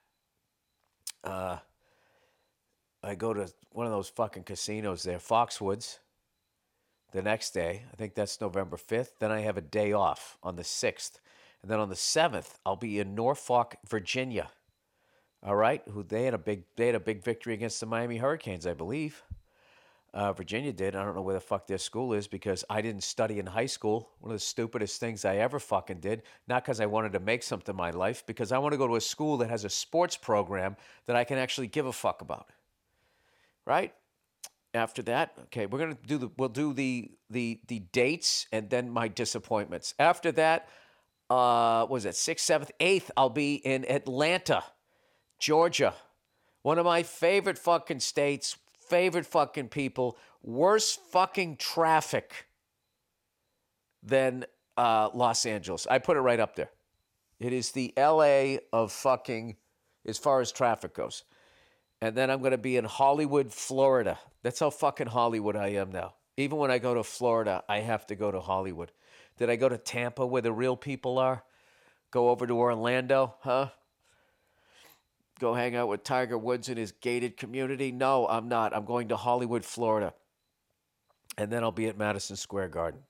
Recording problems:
none

